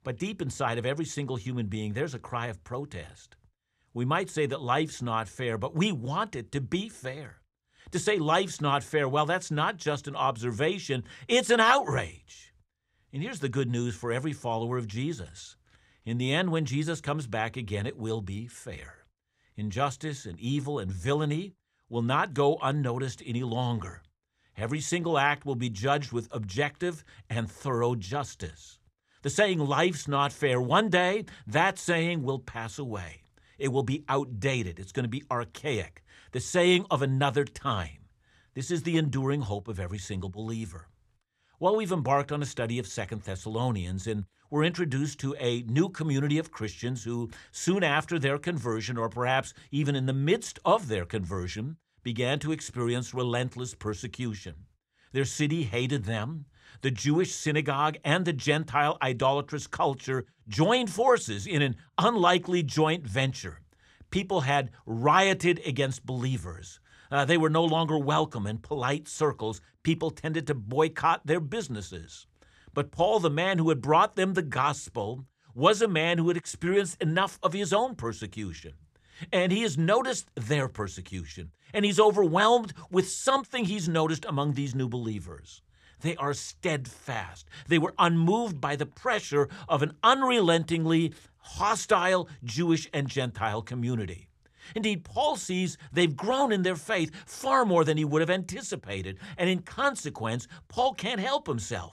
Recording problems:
none

